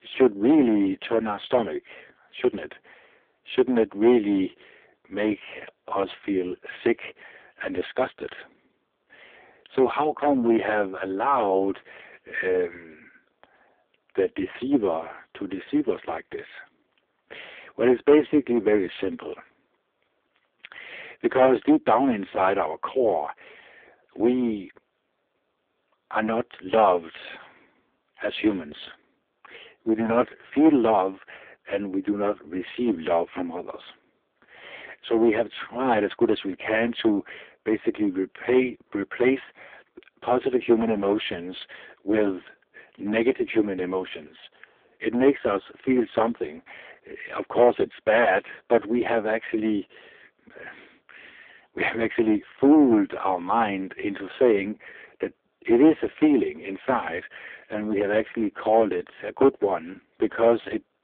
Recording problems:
phone-call audio; poor line
distortion; slight; 3% of the sound clipped

